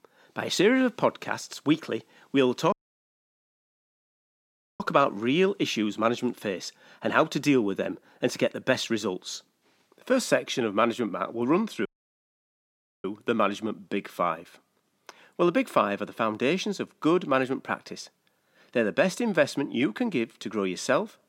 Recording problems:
audio cutting out; at 2.5 s for 2 s and at 12 s for 1 s

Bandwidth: 16 kHz